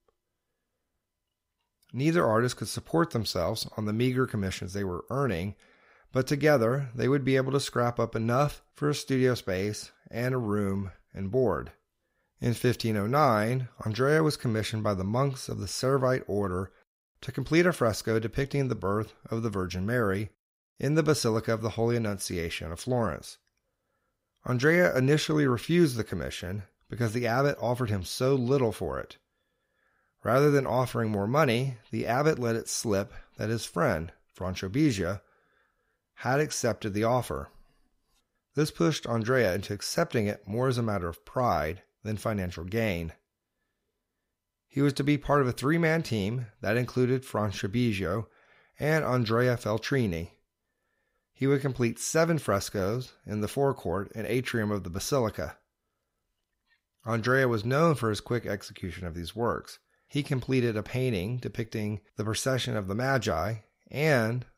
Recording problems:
none

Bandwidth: 15.5 kHz